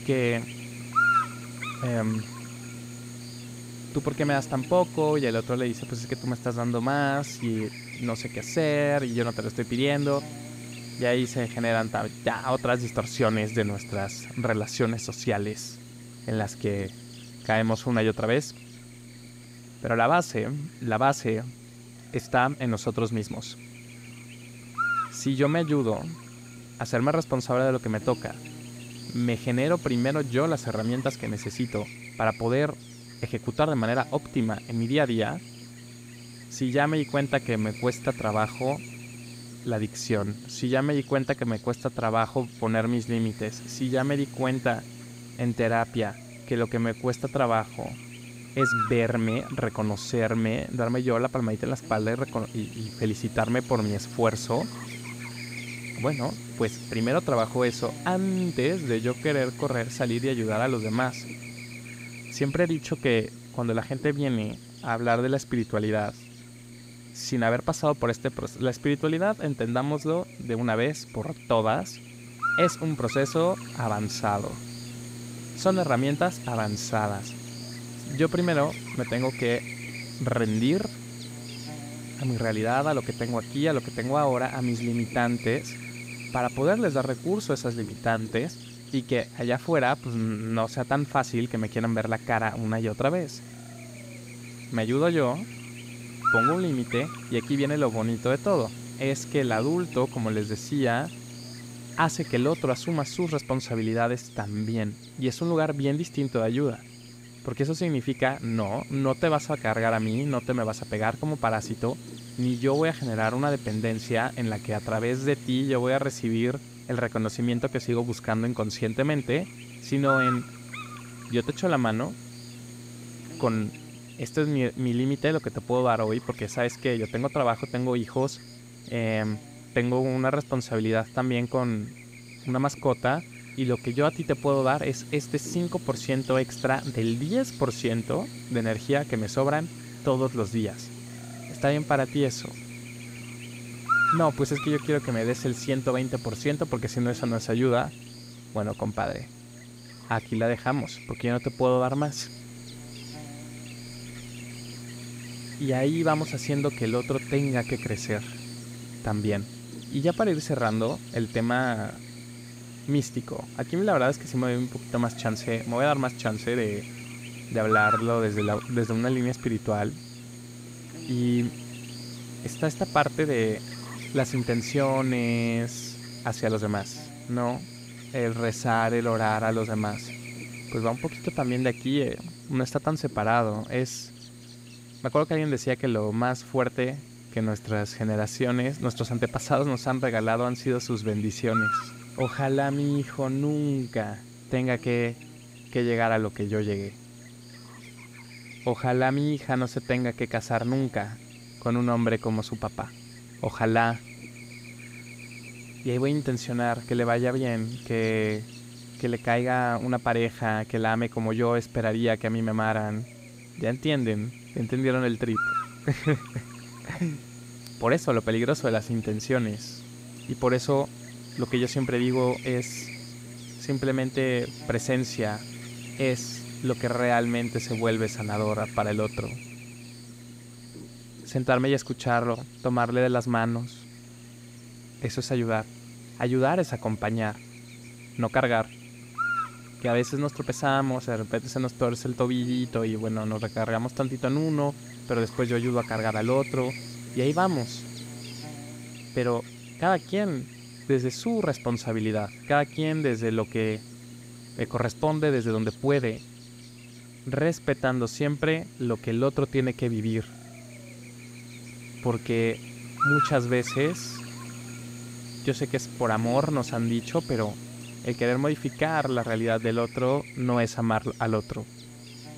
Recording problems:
electrical hum; loud; throughout; 60 Hz, 9 dB below the speech

